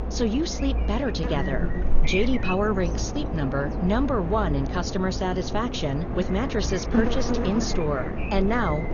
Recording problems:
garbled, watery; slightly; nothing above 6.5 kHz
electrical hum; loud; throughout; 60 Hz, 5 dB below the speech

